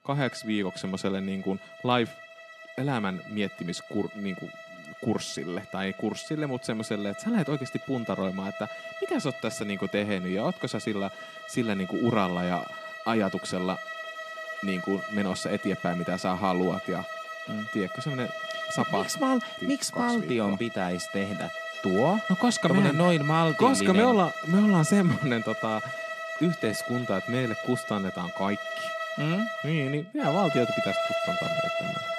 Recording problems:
background music; loud; throughout; 7 dB below the speech

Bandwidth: 14 kHz